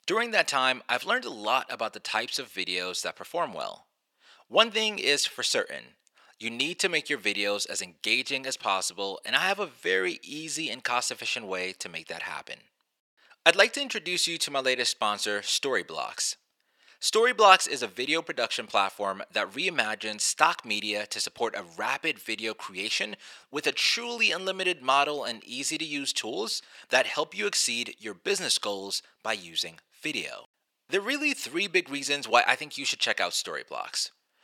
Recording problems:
thin; very; fading below 600 Hz

